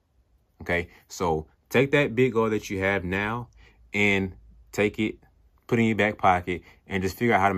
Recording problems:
abrupt cut into speech; at the end

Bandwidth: 14.5 kHz